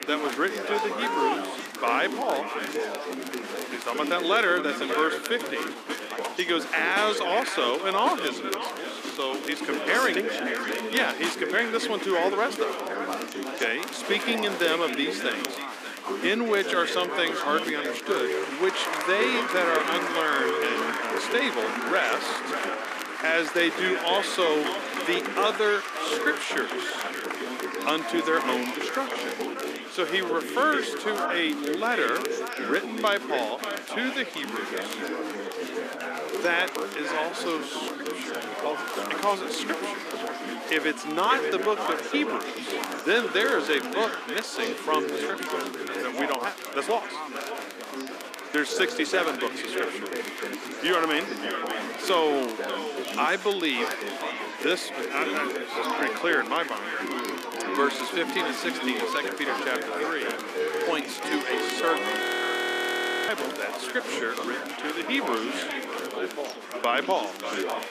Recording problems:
echo of what is said; strong; throughout; 590 ms later, 10 dB below the speech
thin; somewhat; fading below 250 Hz
chatter from many people; loud; throughout; 4 dB below the speech
crackle, like an old record; noticeable; 15 dB below the speech
audio freezing; at 1:02 for 1 s

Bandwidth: 14.5 kHz